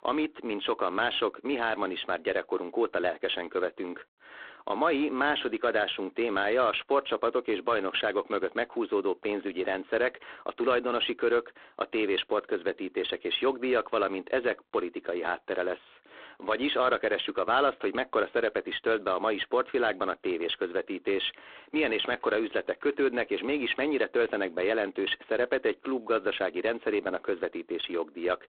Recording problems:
phone-call audio; poor line

